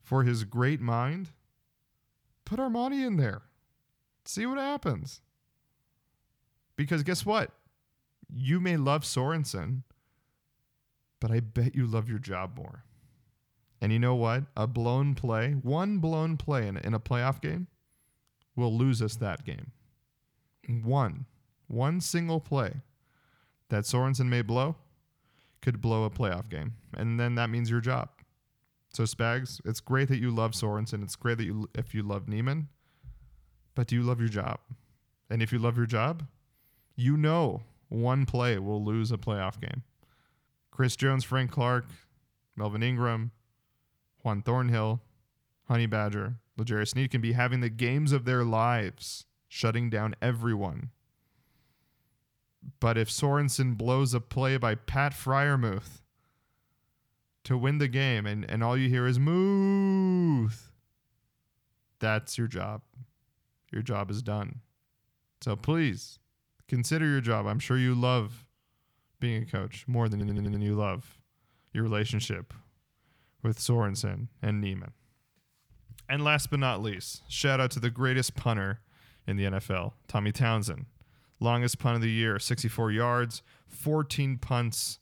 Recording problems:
audio stuttering; at 1:10

